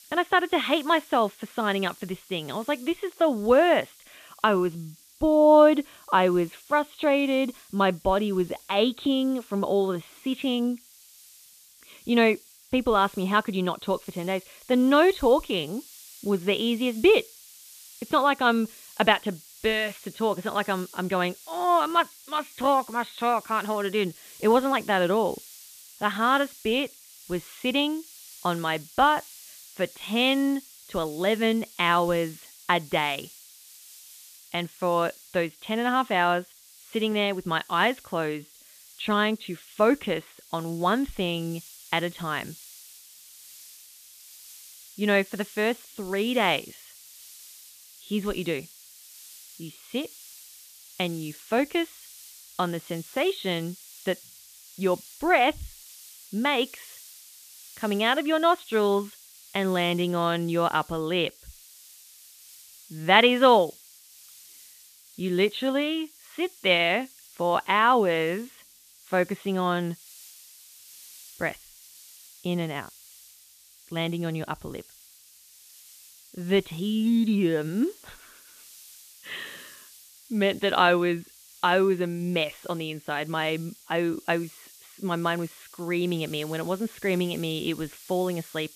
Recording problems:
high frequencies cut off; severe; nothing above 4 kHz
hiss; faint; throughout; 20 dB below the speech

